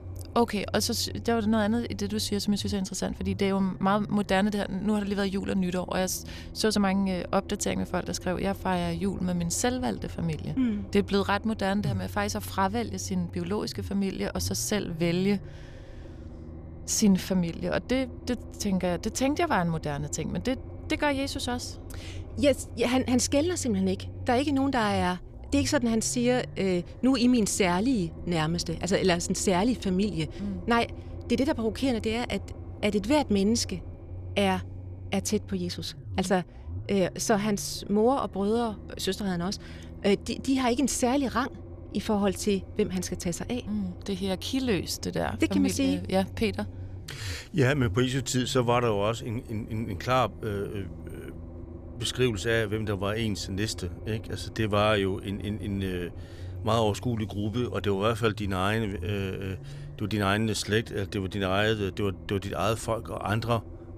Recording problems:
low rumble; faint; throughout; 20 dB below the speech

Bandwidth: 14.5 kHz